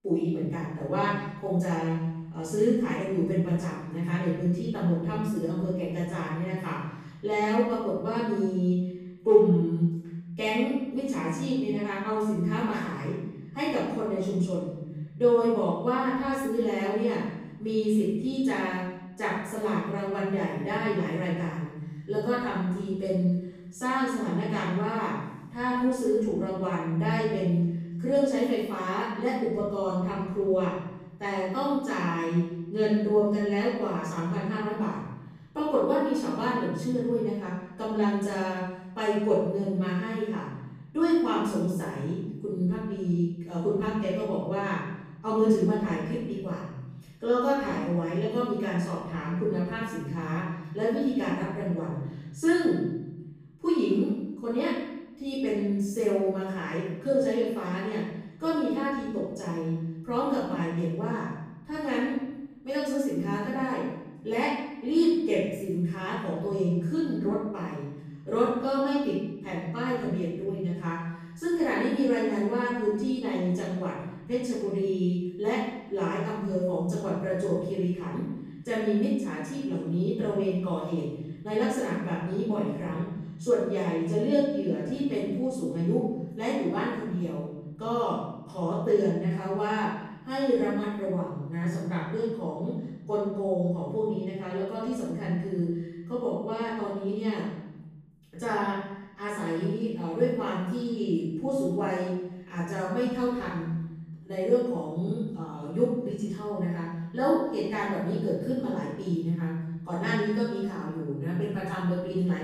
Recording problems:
room echo; strong; dies away in 1 s
off-mic speech; far

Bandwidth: 15 kHz